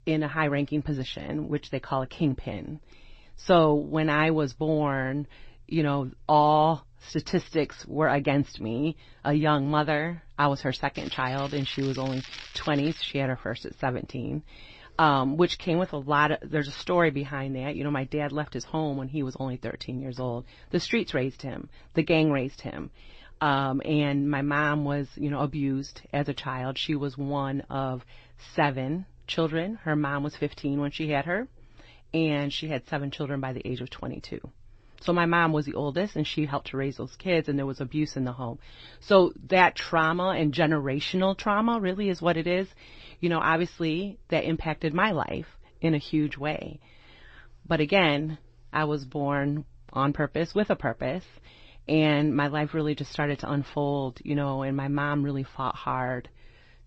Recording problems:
garbled, watery; slightly; nothing above 8 kHz
crackling; noticeable; from 11 to 13 s; 15 dB below the speech

